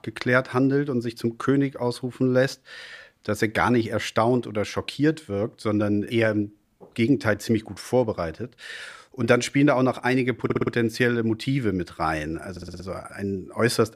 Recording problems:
audio stuttering; at 10 s and at 13 s

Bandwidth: 15 kHz